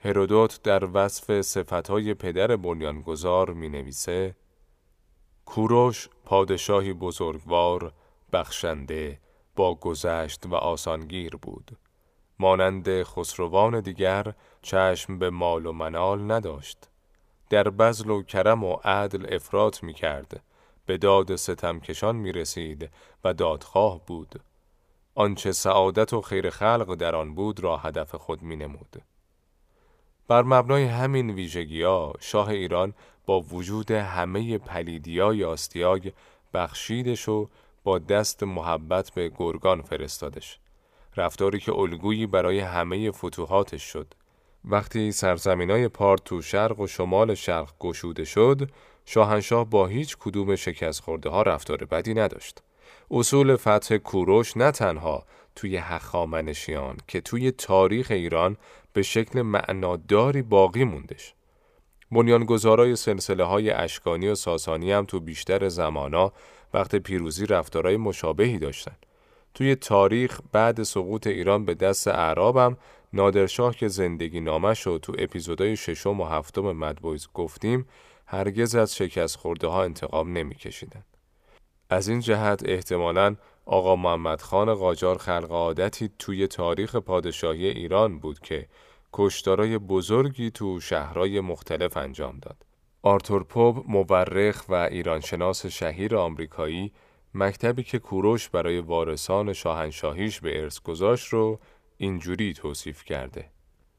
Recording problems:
none

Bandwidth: 15 kHz